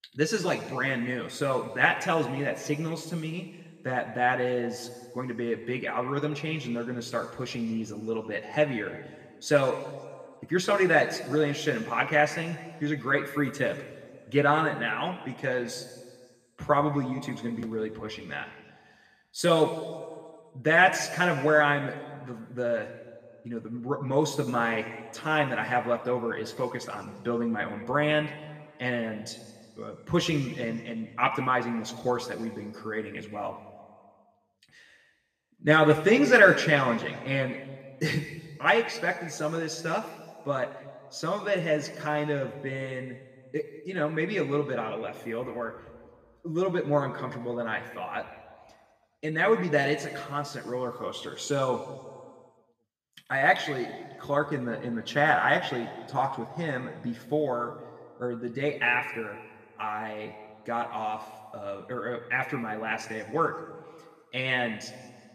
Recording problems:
room echo; noticeable; dies away in 1.5 s
off-mic speech; somewhat distant

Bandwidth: 15 kHz